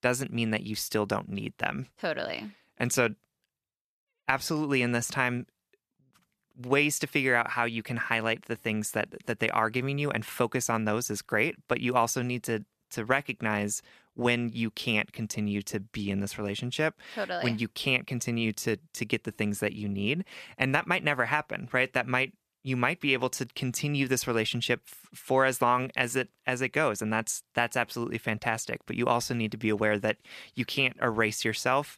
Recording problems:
none

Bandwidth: 14.5 kHz